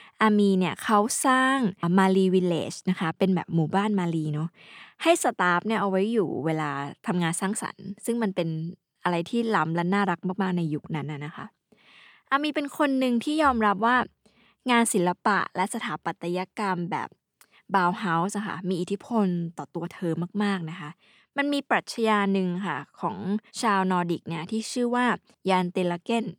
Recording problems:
none

